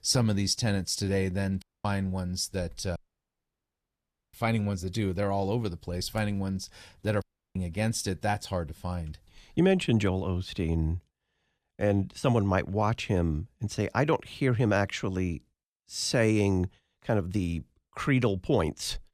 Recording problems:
audio cutting out; at 1.5 s, at 3 s for 1.5 s and at 7 s

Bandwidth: 14.5 kHz